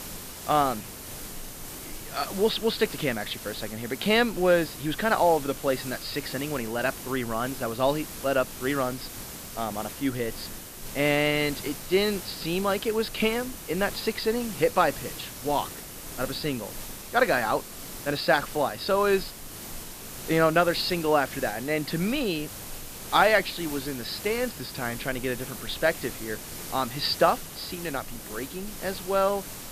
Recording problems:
high frequencies cut off; noticeable; nothing above 5.5 kHz
hiss; noticeable; throughout; 10 dB below the speech

